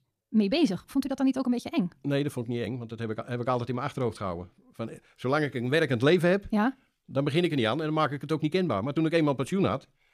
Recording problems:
wrong speed, natural pitch; too fast; 1.5 times normal speed

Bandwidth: 14.5 kHz